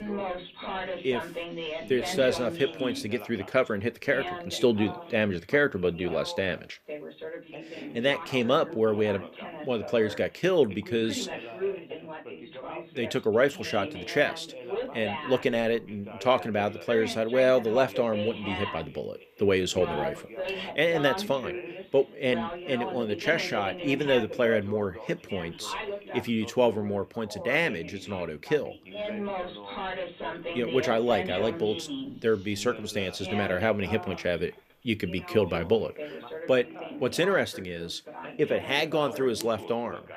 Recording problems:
background chatter; loud; throughout; 2 voices, 9 dB below the speech

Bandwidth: 14.5 kHz